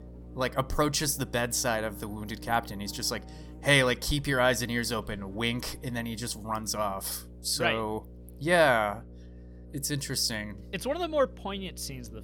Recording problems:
electrical hum; faint; throughout; 60 Hz, 25 dB below the speech

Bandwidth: 17.5 kHz